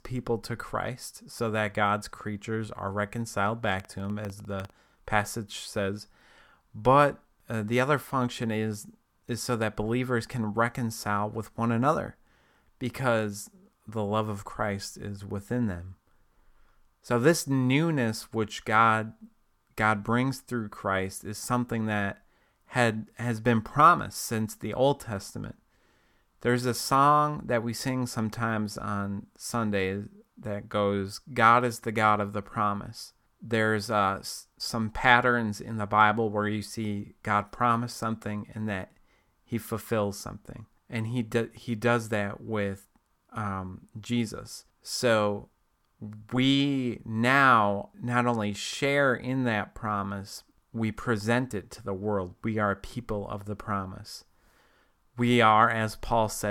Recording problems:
abrupt cut into speech; at the end

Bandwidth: 18 kHz